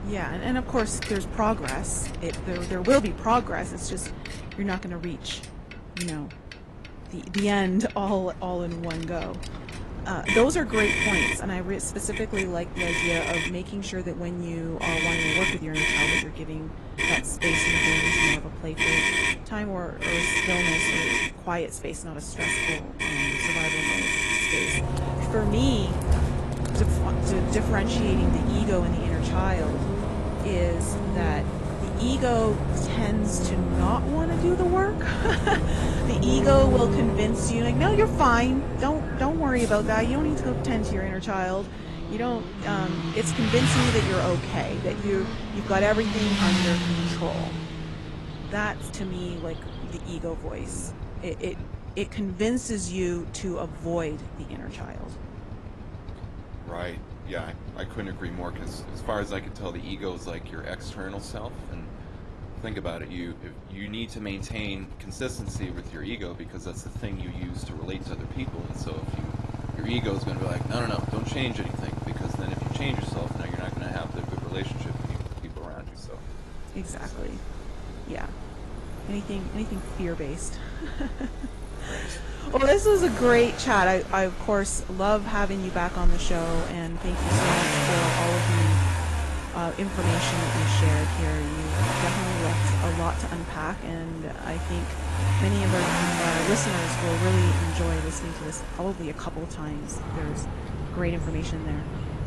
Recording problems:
garbled, watery; slightly
traffic noise; very loud; throughout; 2 dB above the speech
wind noise on the microphone; occasional gusts; 15 dB below the speech

